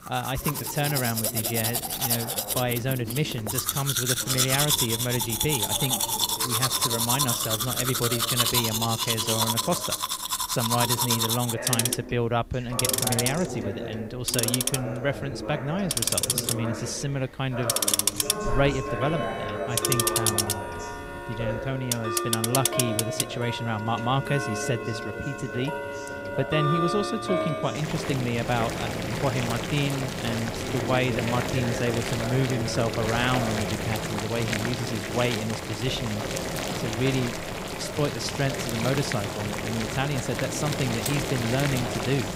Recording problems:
household noises; very loud; throughout; 2 dB above the speech
voice in the background; loud; throughout; 8 dB below the speech

